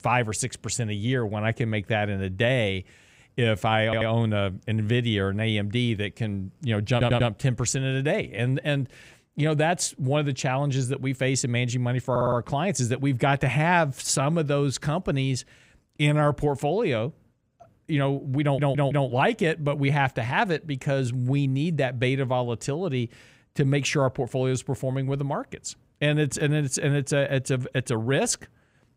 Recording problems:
audio stuttering; 4 times, first at 4 s

